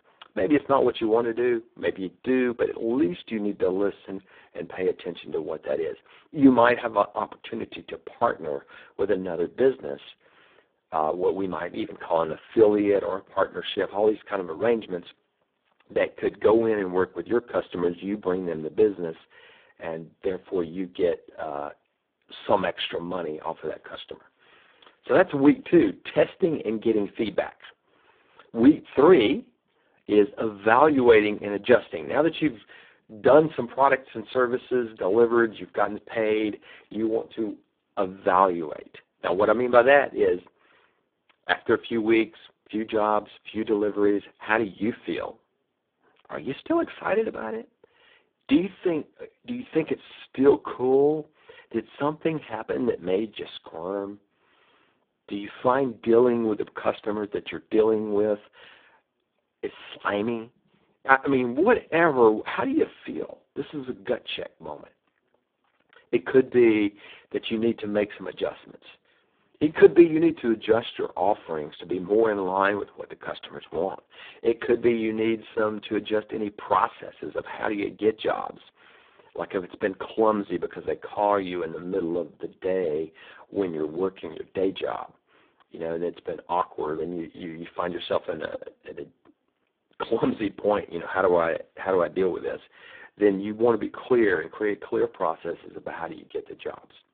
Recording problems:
phone-call audio; poor line

